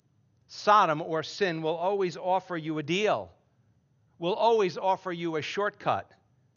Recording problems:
garbled, watery; slightly; nothing above 6.5 kHz
high-pitched whine; very faint; throughout; 6 kHz, 65 dB below the speech

